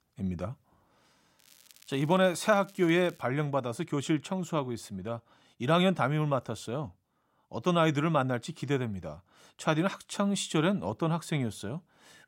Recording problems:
crackling; faint; from 1.5 to 3 s; 25 dB below the speech

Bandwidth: 16 kHz